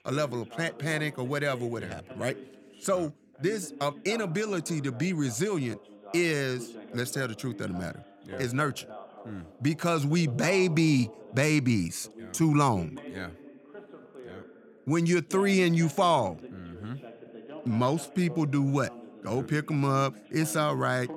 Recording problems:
voice in the background; noticeable; throughout; 20 dB below the speech

